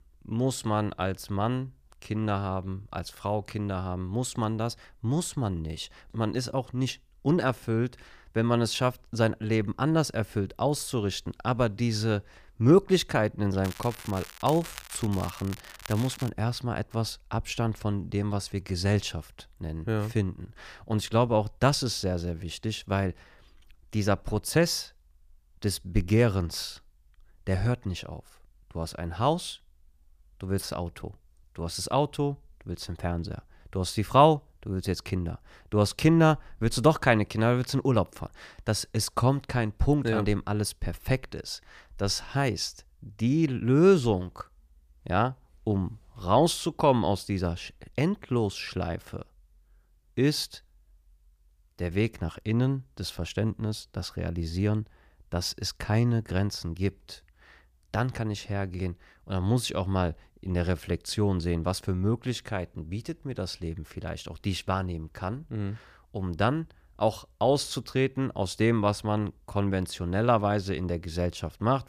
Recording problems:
crackling; noticeable; from 14 to 16 s; 15 dB below the speech

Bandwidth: 15 kHz